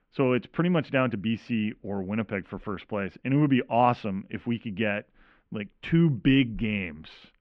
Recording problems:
muffled; very; fading above 2.5 kHz

